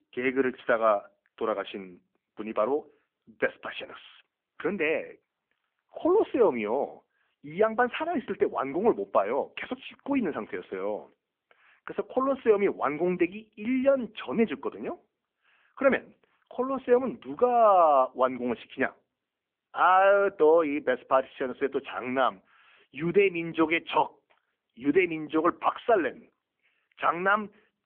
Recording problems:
phone-call audio; nothing above 3.5 kHz

